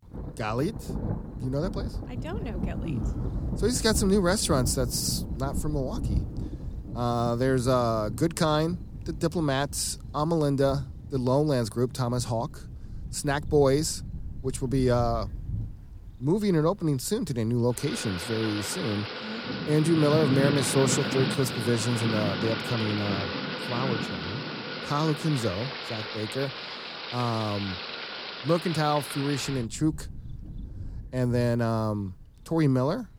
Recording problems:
rain or running water; loud; throughout; 7 dB below the speech

